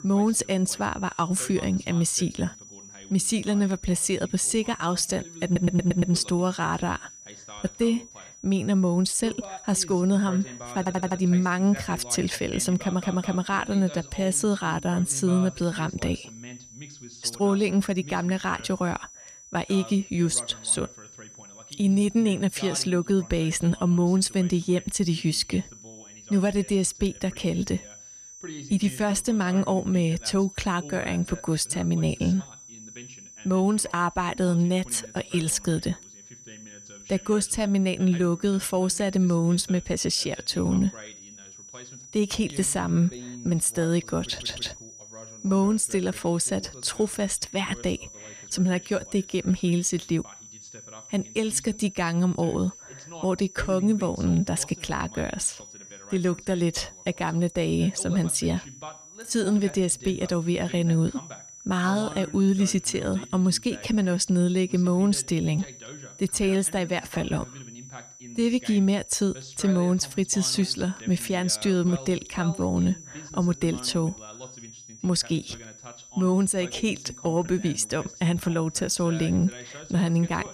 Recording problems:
high-pitched whine; noticeable; throughout; 6 kHz, 20 dB below the speech
voice in the background; noticeable; throughout; 20 dB below the speech
audio stuttering; 4 times, first at 5.5 s

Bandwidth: 14.5 kHz